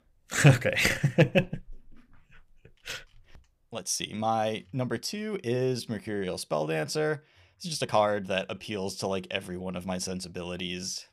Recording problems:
uneven, jittery; strongly; from 1.5 to 10 s

